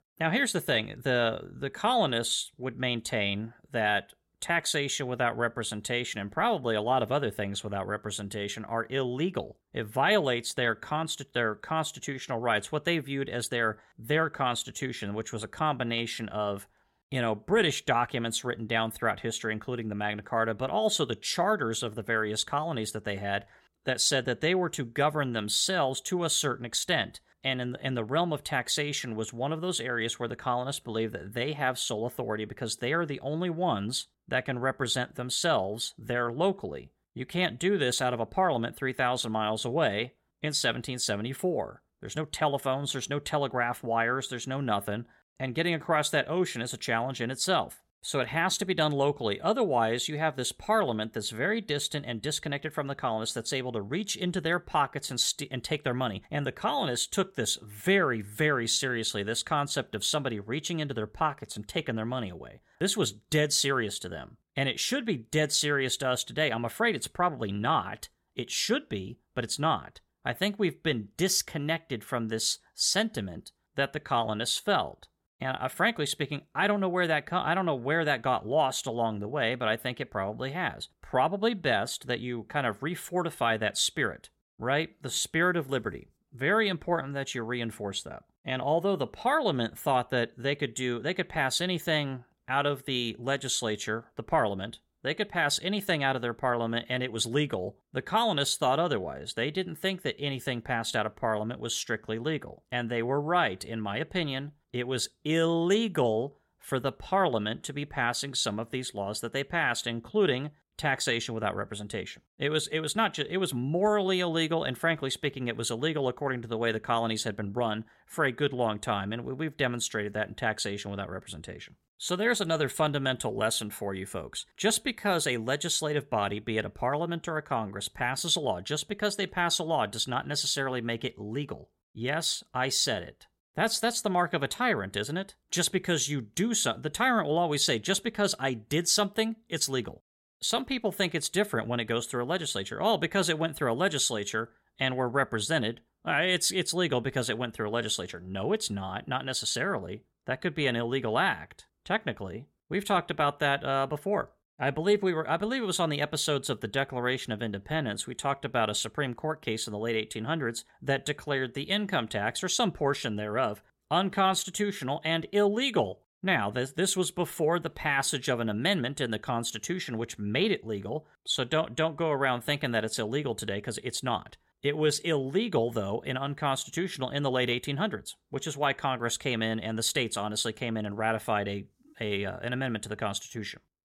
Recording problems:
none

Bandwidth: 16.5 kHz